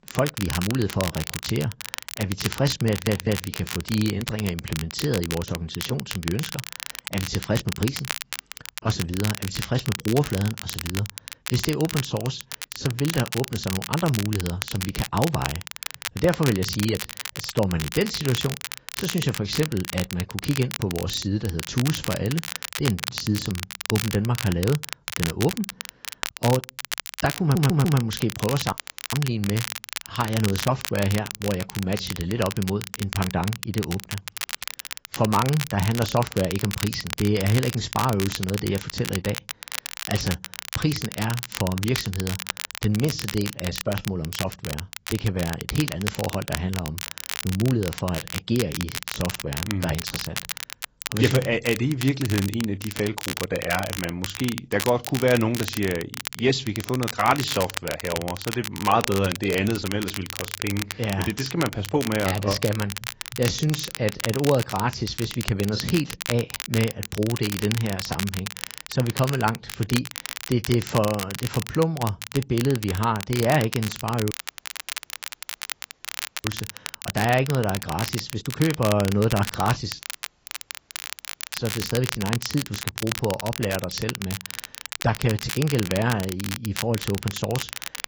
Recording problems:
garbled, watery; badly; nothing above 7.5 kHz
crackle, like an old record; loud; 7 dB below the speech
audio stuttering; at 3 s and at 27 s
audio cutting out; at 29 s, at 1:14 for 2 s and at 1:20 for 1.5 s

